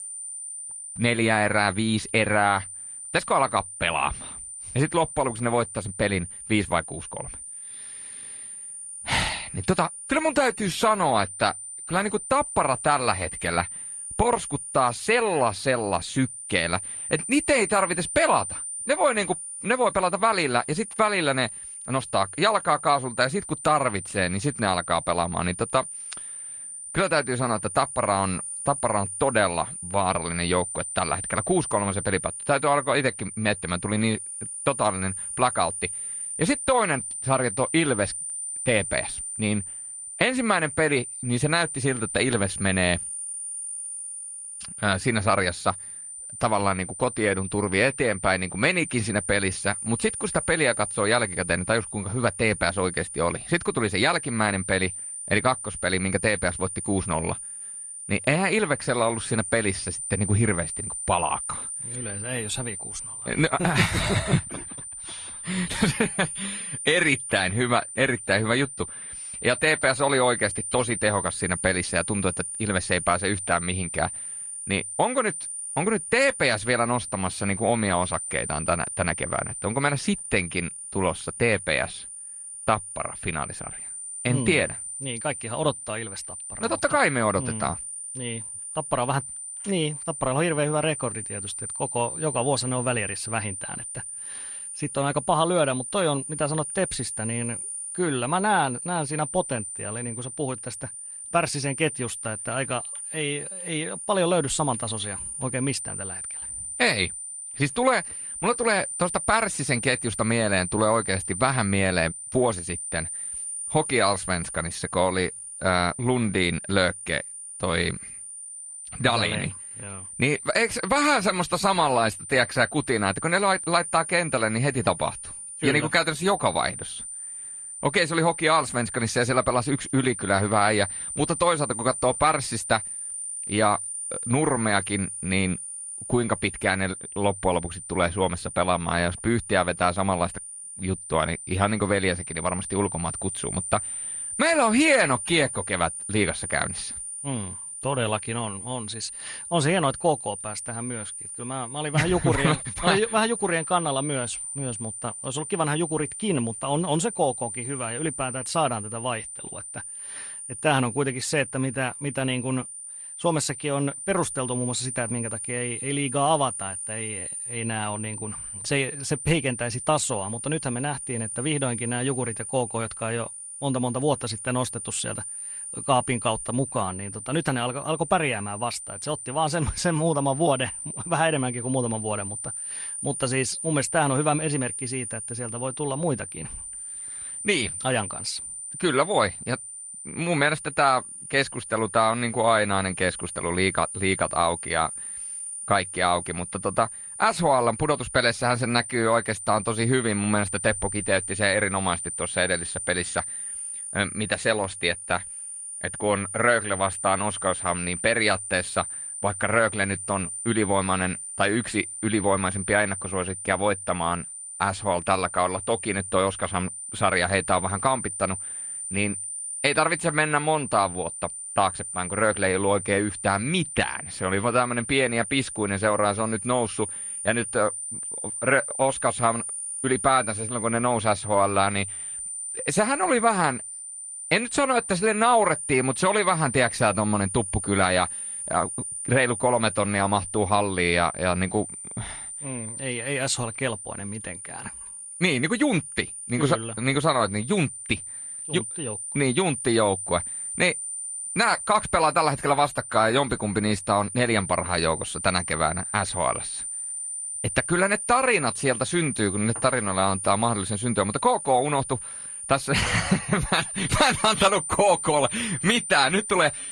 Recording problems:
garbled, watery; slightly; nothing above 10 kHz
high-pitched whine; loud; throughout; 9 kHz, 7 dB below the speech

